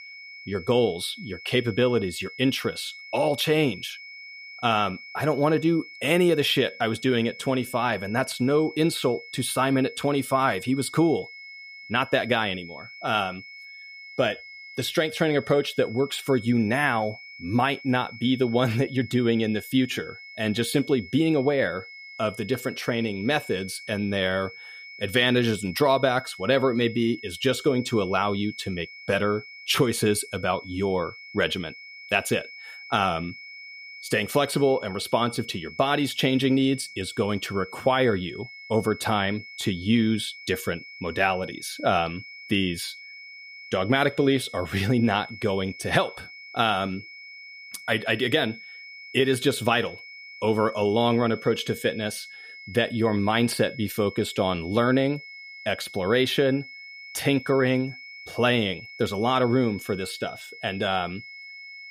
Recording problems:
high-pitched whine; noticeable; throughout; 2 kHz, 15 dB below the speech

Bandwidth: 15 kHz